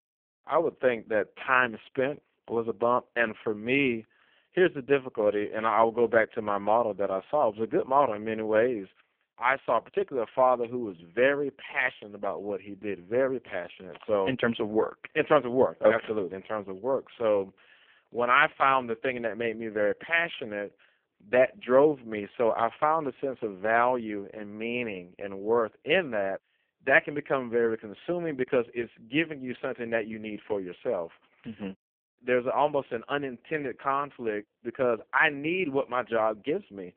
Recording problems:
phone-call audio; poor line

